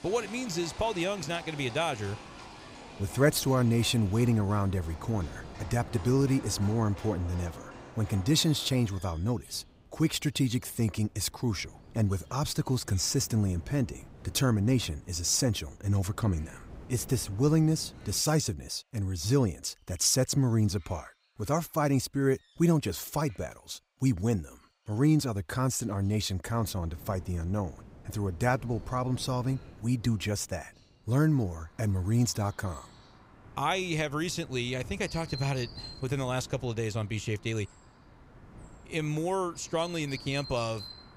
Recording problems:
animal sounds; noticeable; throughout; 20 dB below the speech
wind noise on the microphone; occasional gusts; until 18 s and from 27 s on; 25 dB below the speech

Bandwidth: 15.5 kHz